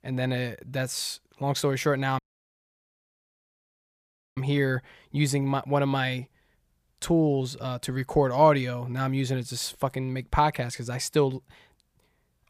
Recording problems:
audio cutting out; at 2 s for 2 s

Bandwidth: 15 kHz